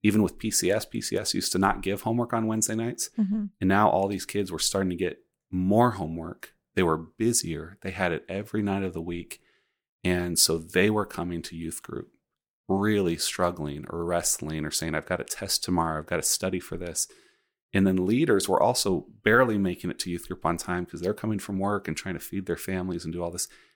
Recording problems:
none

